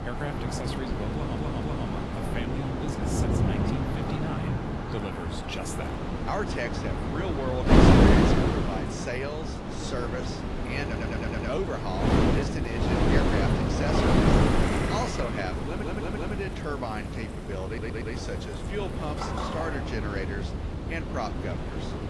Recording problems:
garbled, watery; slightly; nothing above 11.5 kHz
wind noise on the microphone; heavy; 3 dB above the speech
rain or running water; loud; throughout; as loud as the speech
audio stuttering; 4 times, first at 1 s

